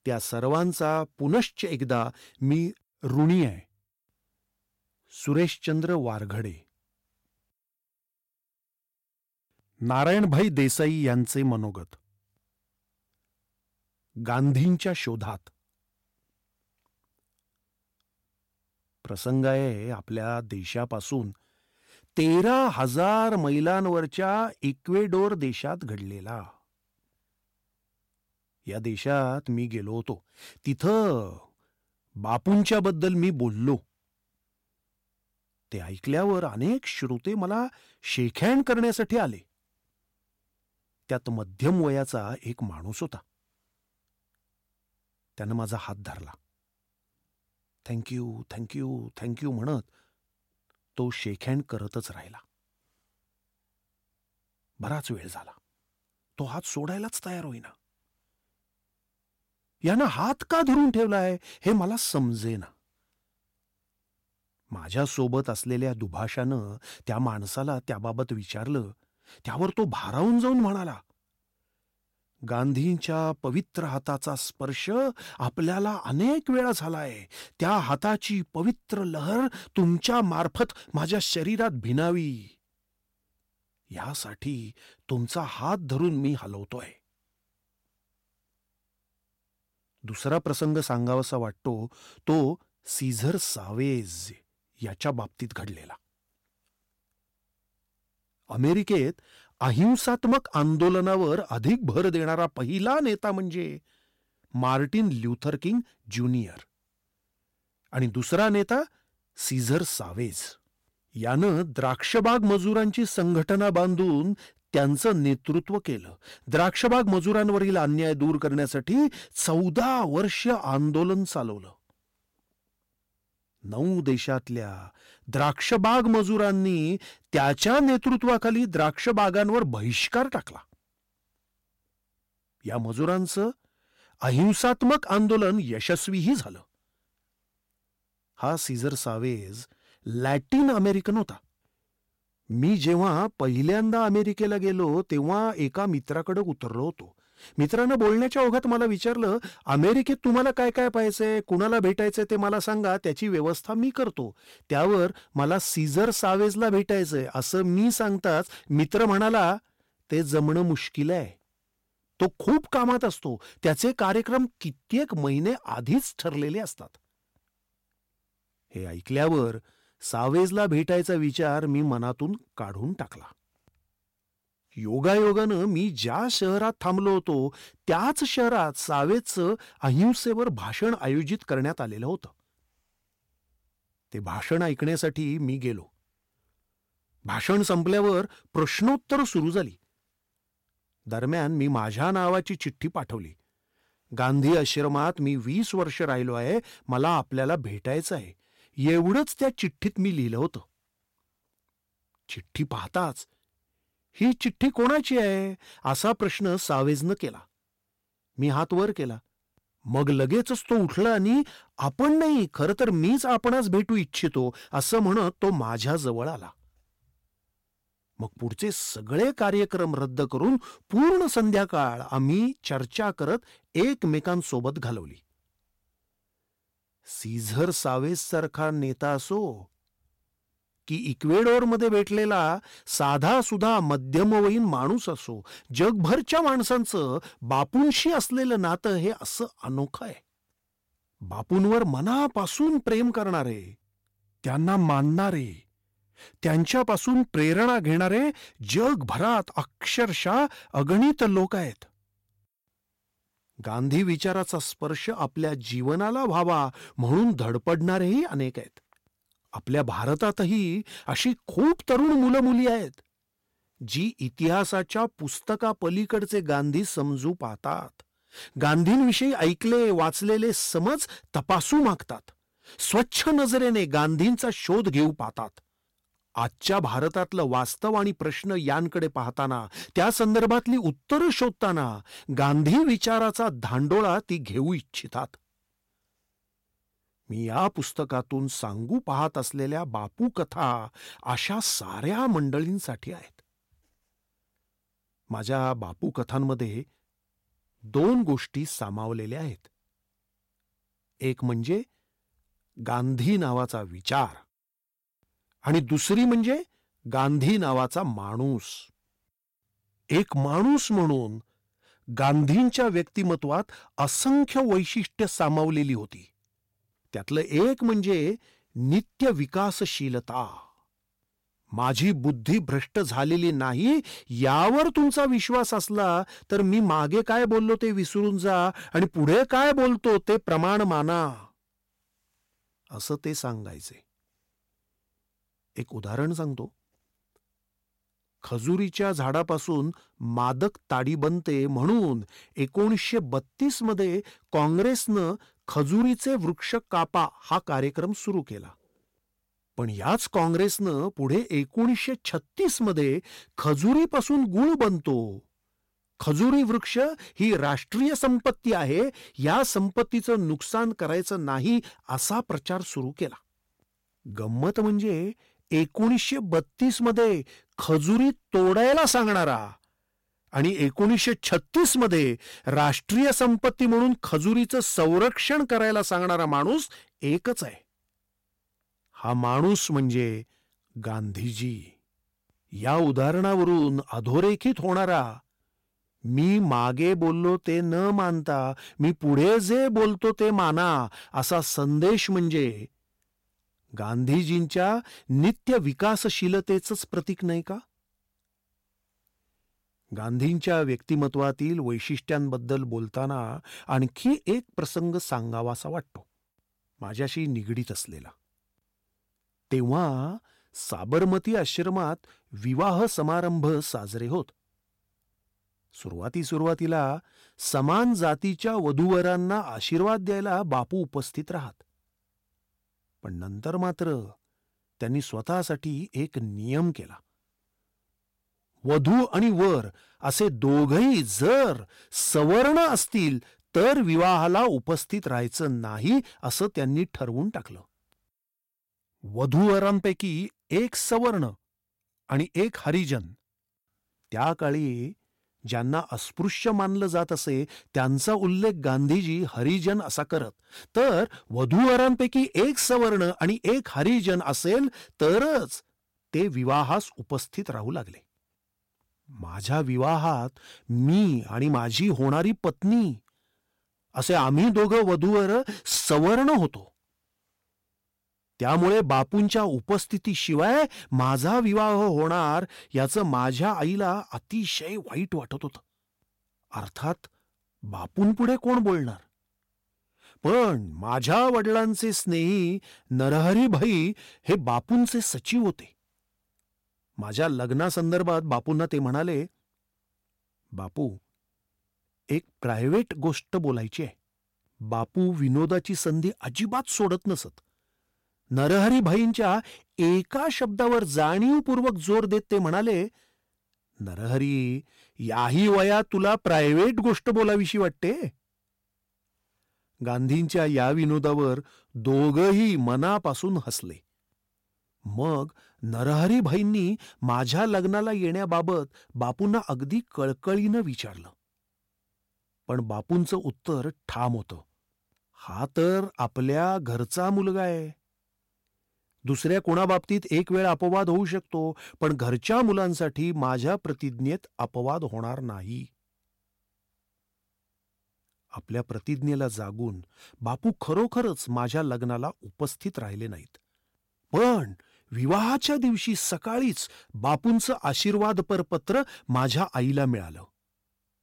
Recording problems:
distortion; slight; 5% of the sound clipped

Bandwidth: 16.5 kHz